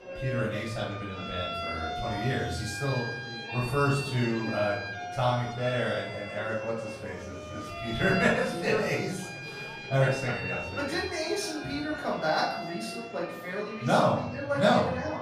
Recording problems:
off-mic speech; far
room echo; noticeable; dies away in 0.6 s
background music; loud; throughout; 8 dB below the speech
murmuring crowd; noticeable; throughout; 15 dB below the speech

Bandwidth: 15 kHz